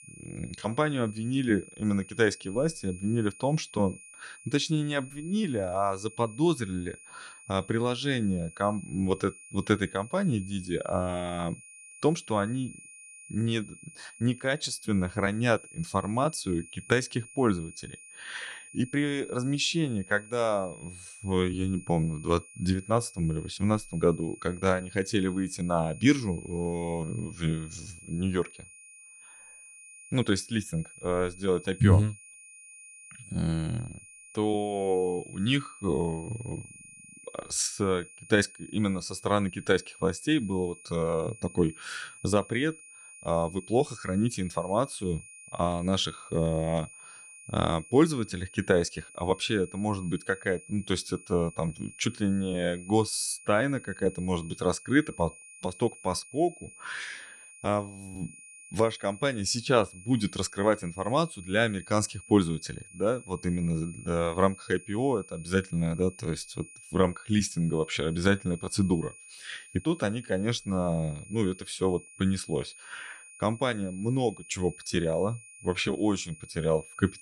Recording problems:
high-pitched whine; noticeable; throughout; 2.5 kHz, 20 dB below the speech

